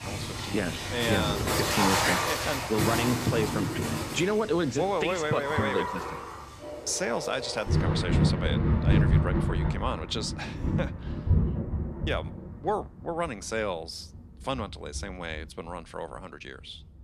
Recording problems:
rain or running water; very loud; throughout; 3 dB above the speech

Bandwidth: 14 kHz